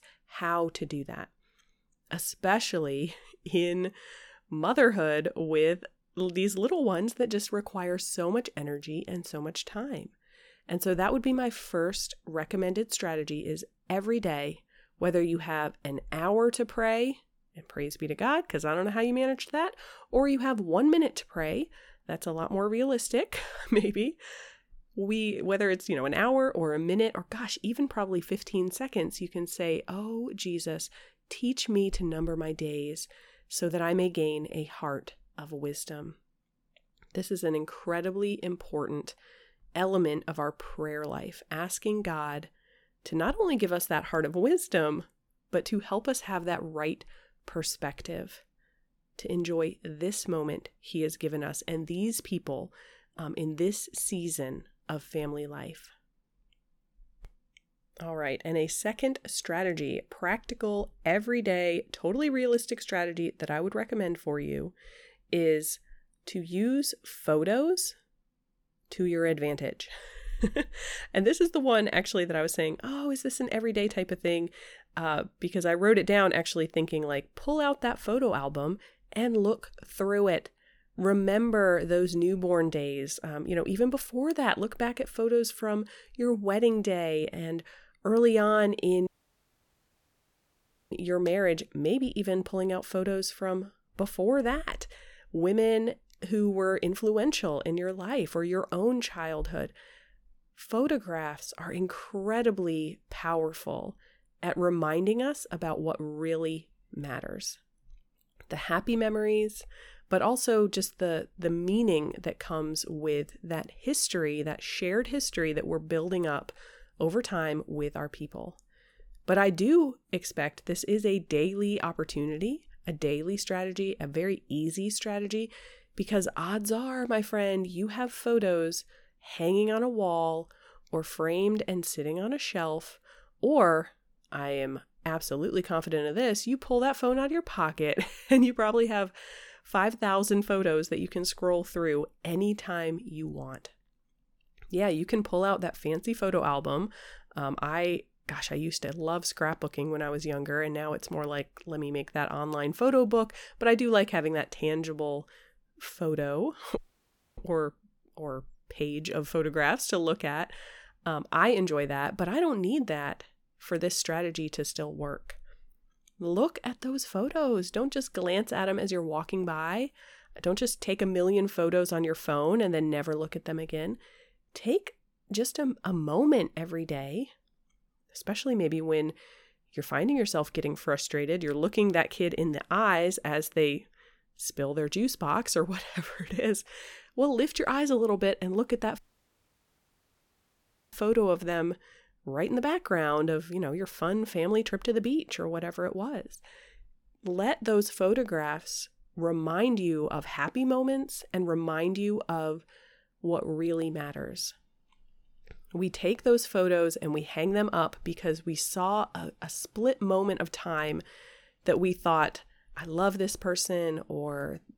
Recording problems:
audio cutting out; at 1:29 for 2 s, at 2:37 for 0.5 s and at 3:09 for 2 s

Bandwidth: 18 kHz